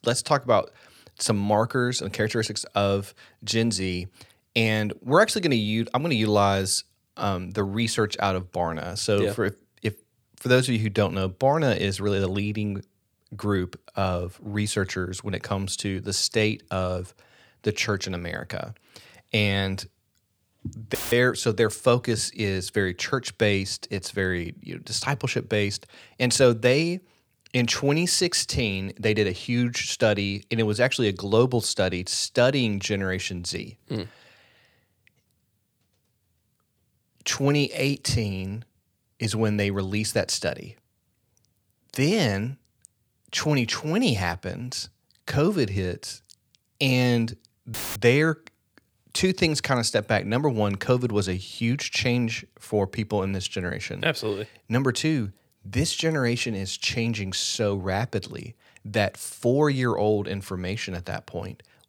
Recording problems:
audio cutting out; filled with static; at 21 s and at 48 s

